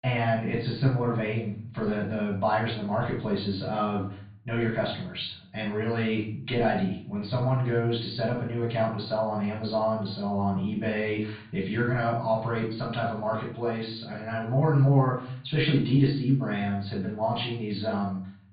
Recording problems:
off-mic speech; far
high frequencies cut off; severe; nothing above 4.5 kHz
room echo; slight; dies away in 0.6 s

